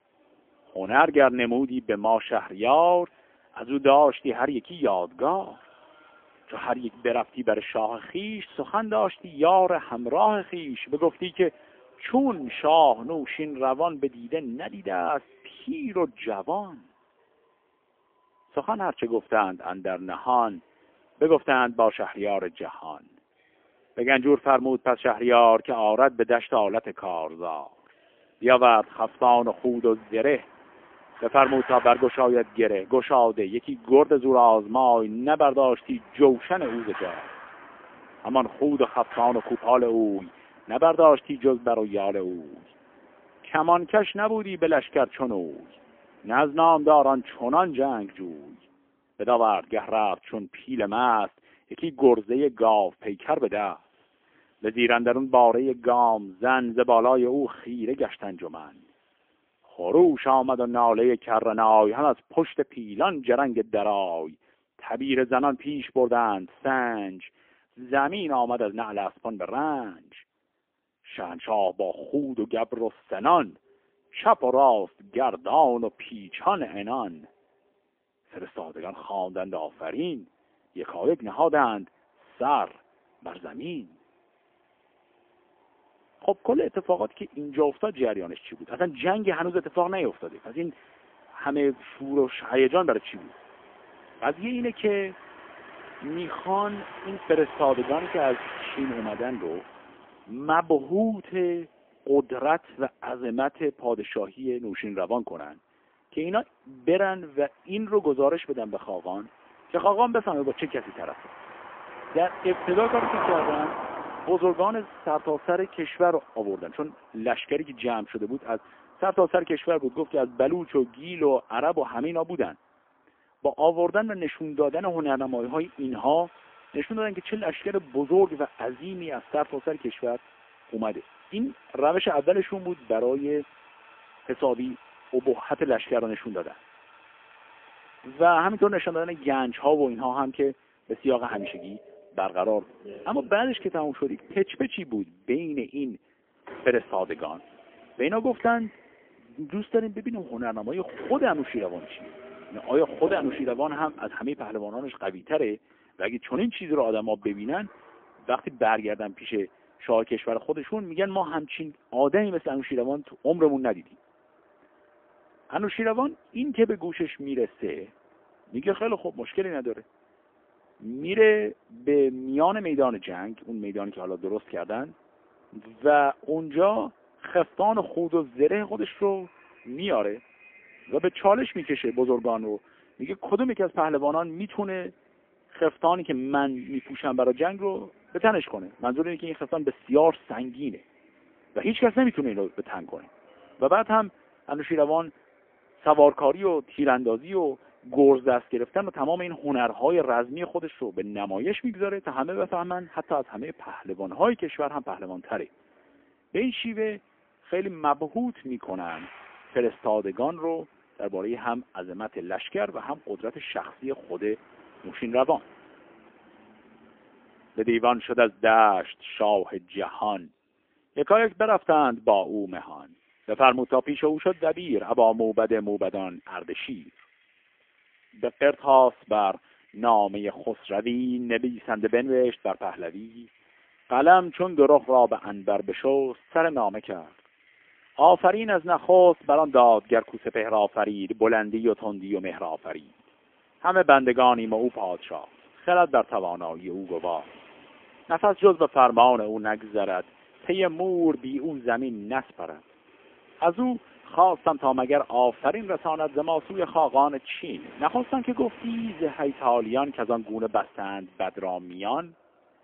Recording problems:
phone-call audio; poor line; nothing above 3.5 kHz
traffic noise; noticeable; throughout; 20 dB below the speech

